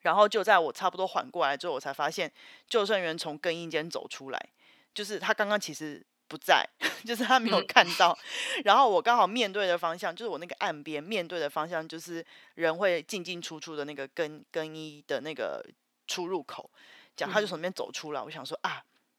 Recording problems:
thin; very; fading below 600 Hz

